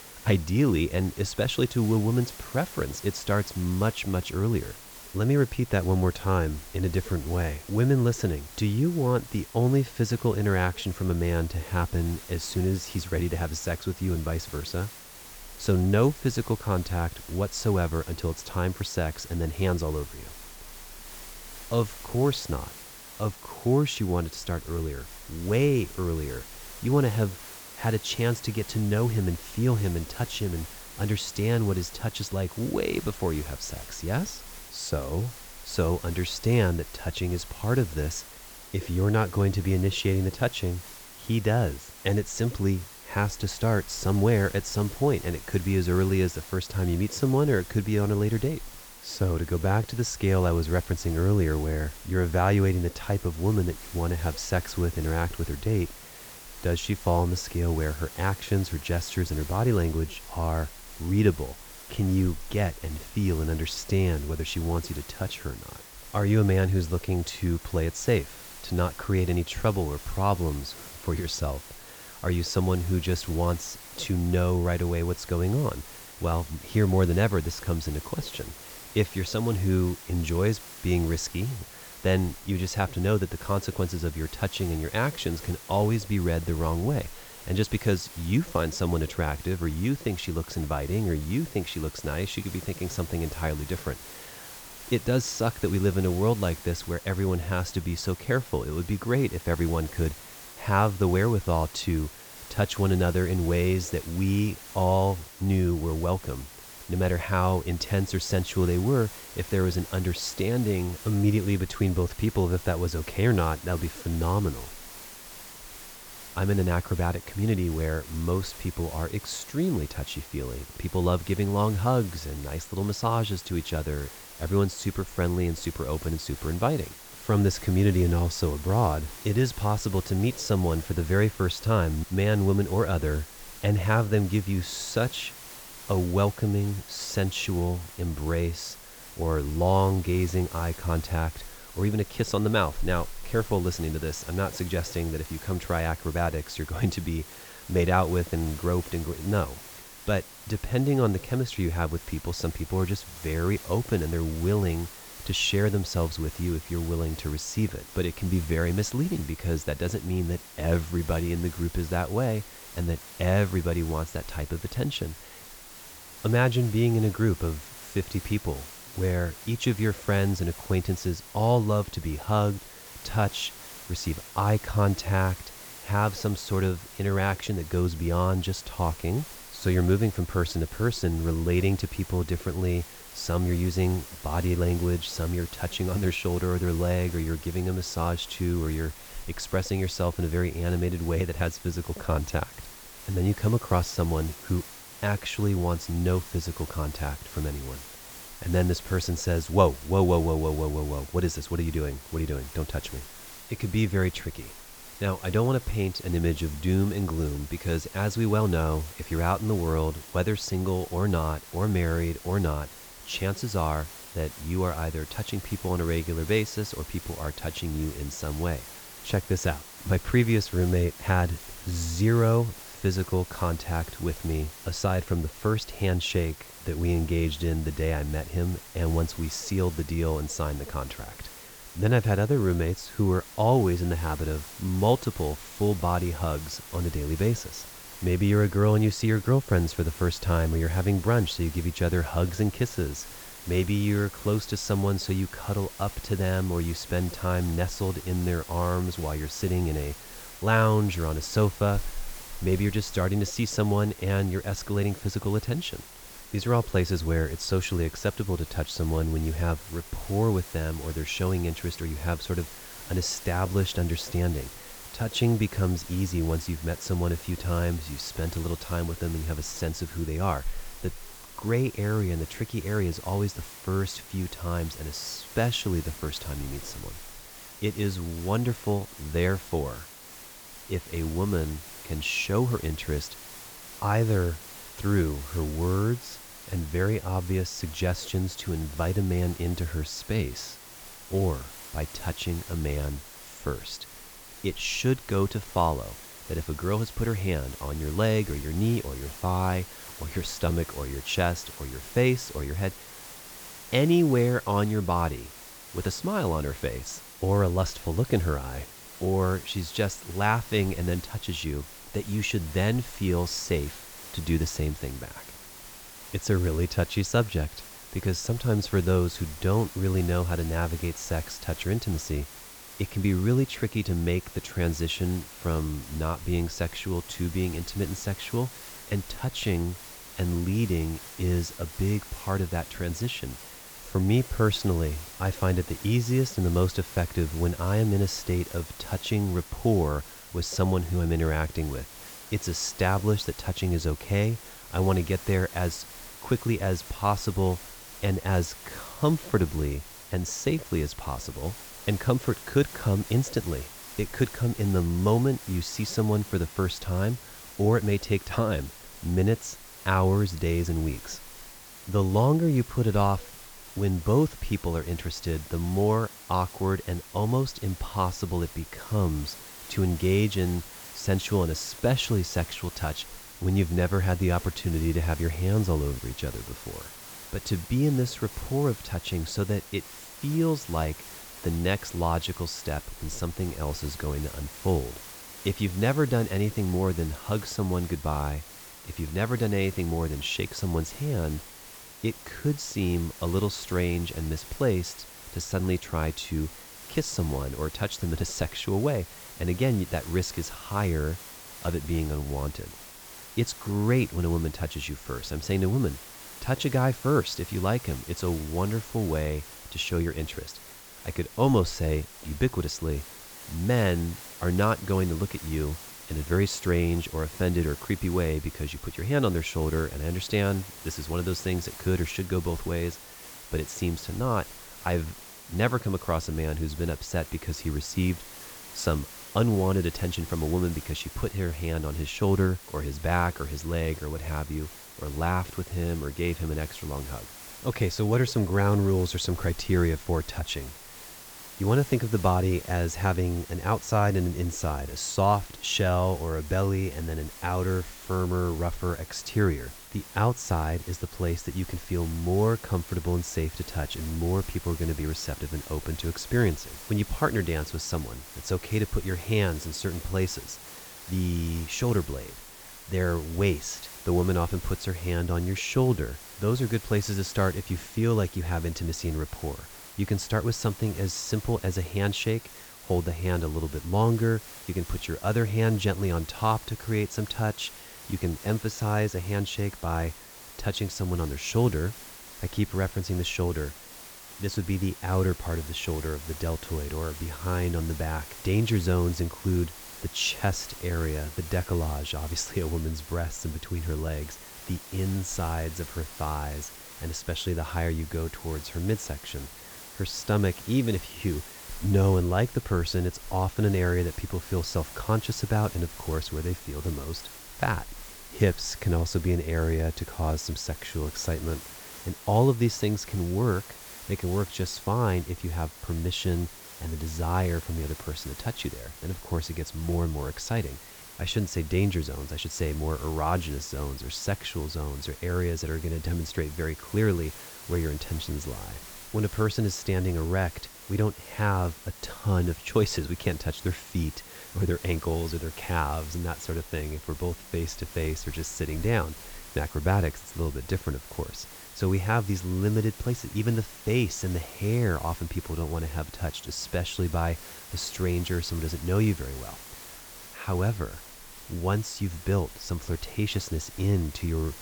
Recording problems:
high frequencies cut off; noticeable; nothing above 8 kHz
hiss; noticeable; throughout; 15 dB below the speech

